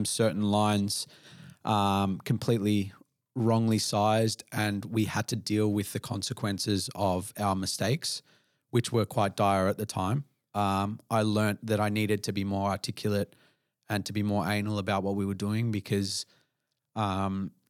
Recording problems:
abrupt cut into speech; at the start

